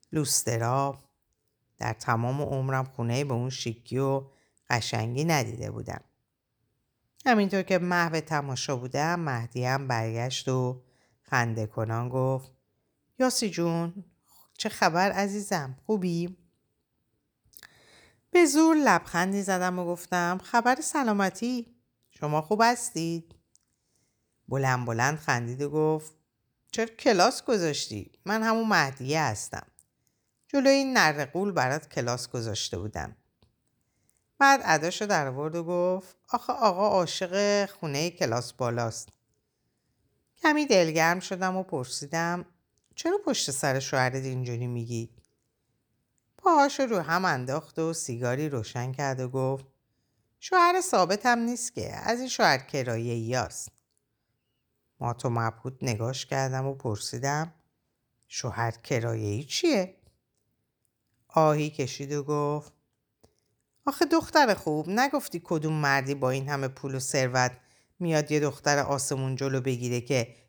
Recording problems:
none

